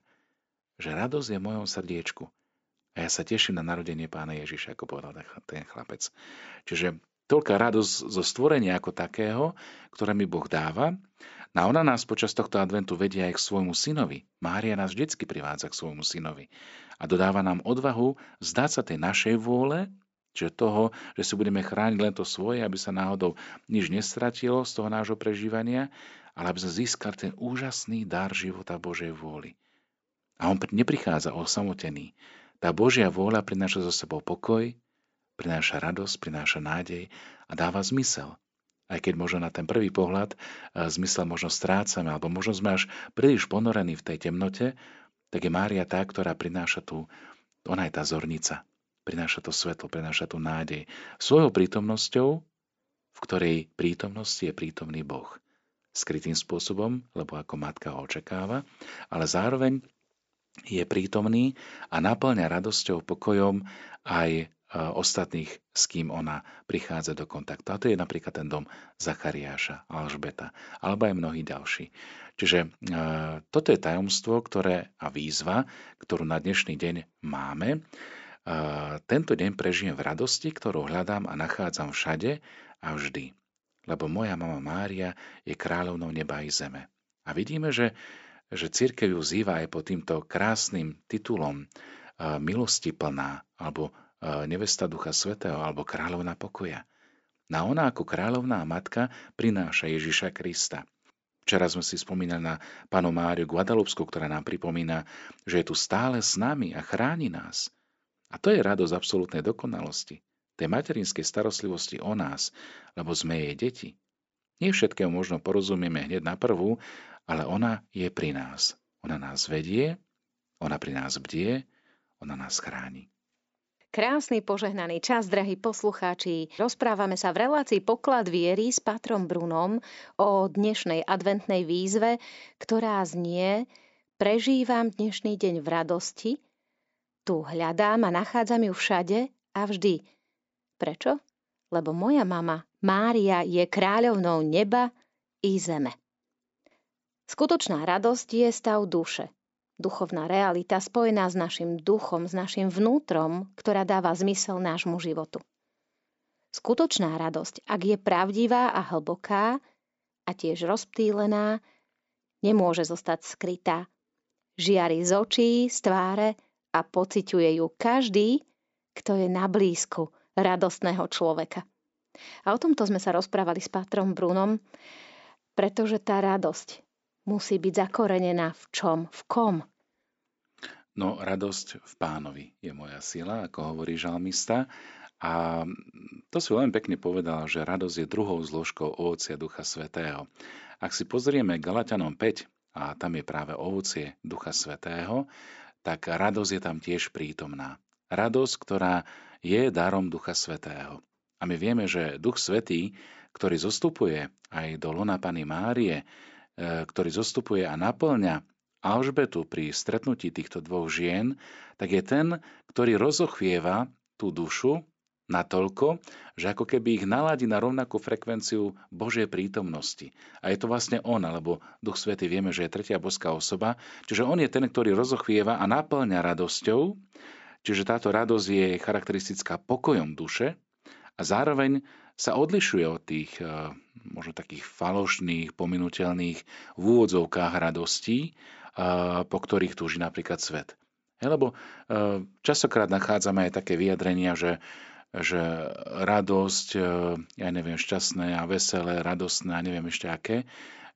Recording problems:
high frequencies cut off; noticeable; nothing above 8 kHz

